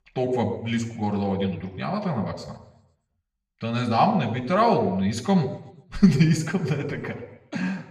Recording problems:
room echo; slight; dies away in 0.7 s
off-mic speech; somewhat distant

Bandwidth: 15.5 kHz